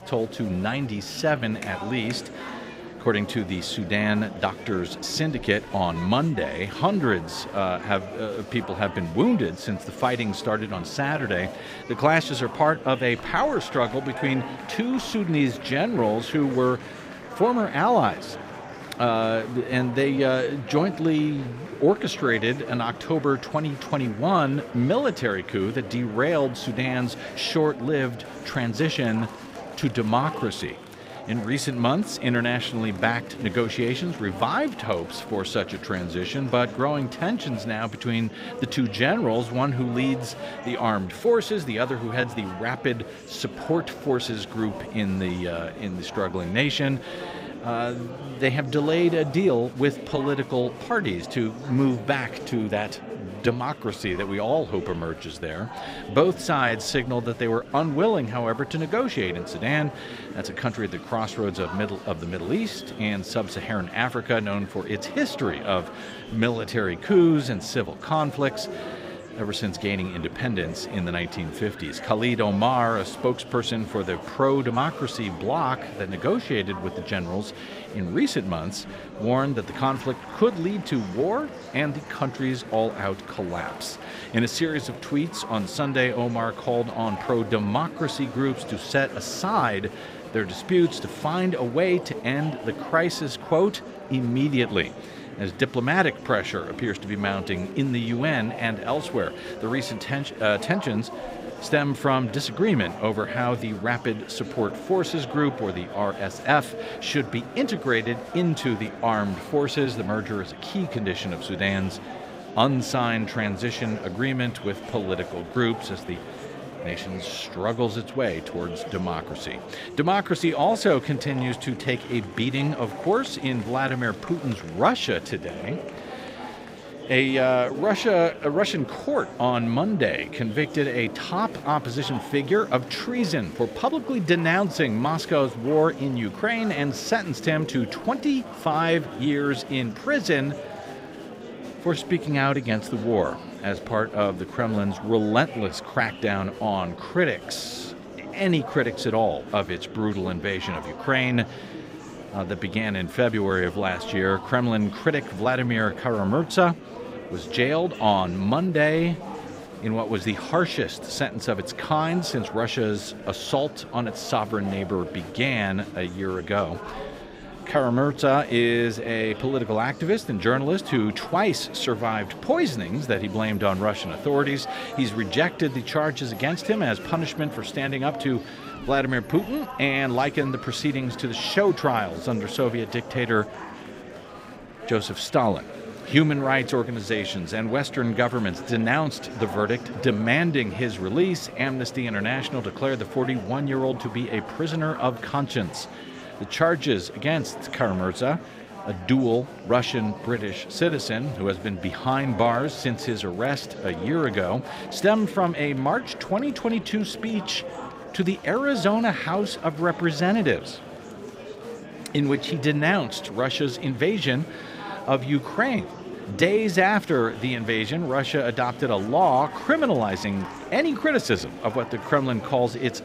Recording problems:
murmuring crowd; noticeable; throughout; 10 dB below the speech

